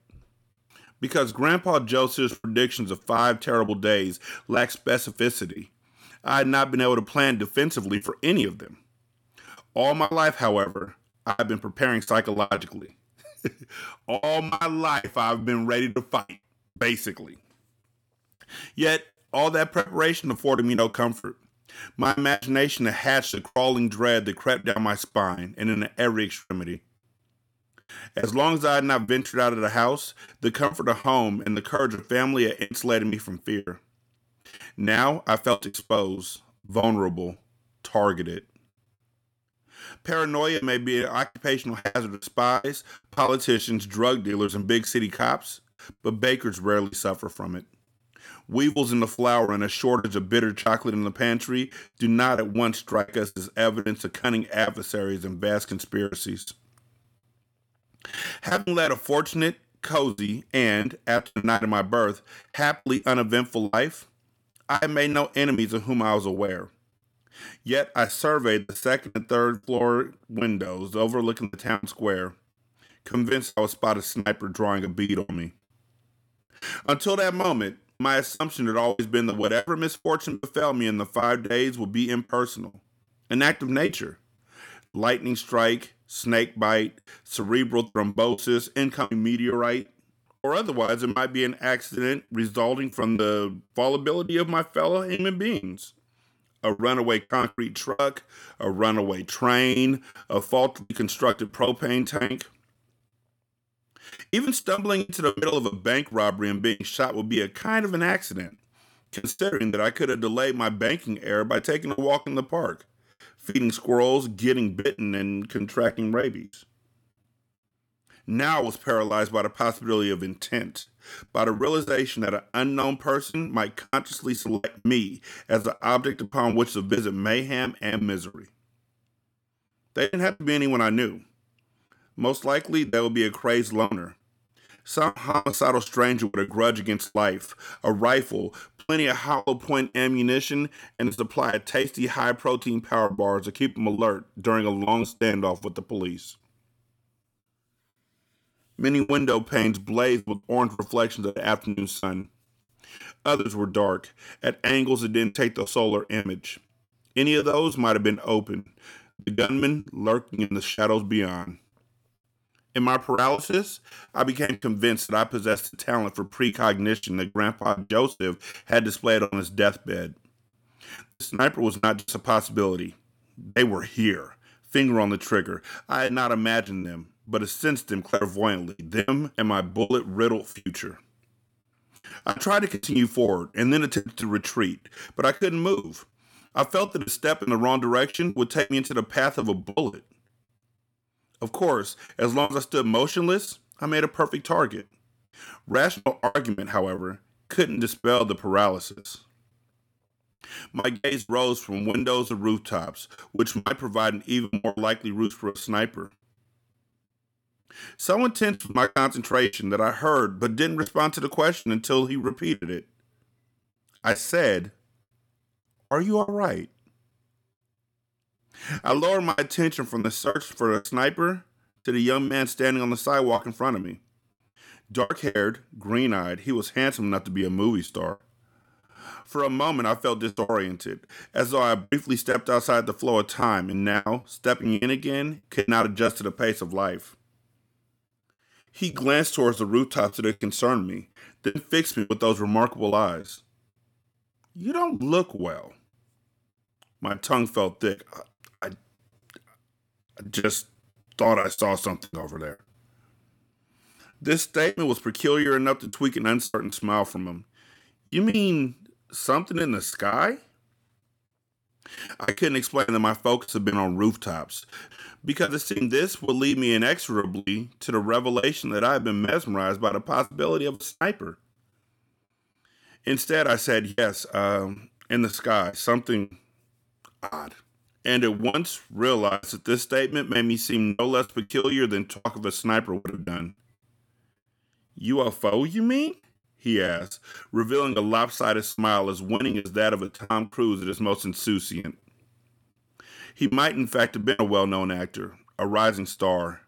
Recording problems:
choppy; very; 10% of the speech affected

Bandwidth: 18 kHz